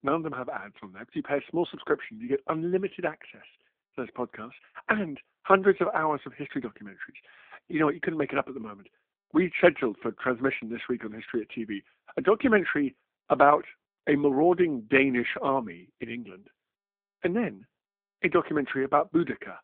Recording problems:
phone-call audio

